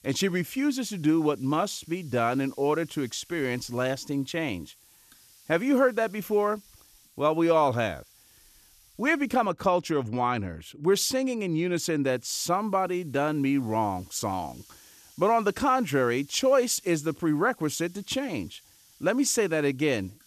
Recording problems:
hiss; faint; until 9.5 s and from 12 s on; 25 dB below the speech

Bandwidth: 14 kHz